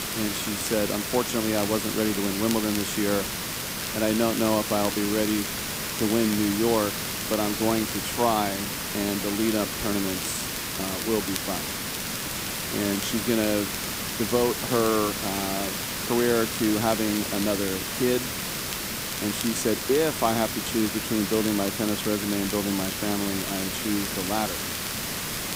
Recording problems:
hiss; loud; throughout; 2 dB below the speech
crackle, like an old record; noticeable; 15 dB below the speech

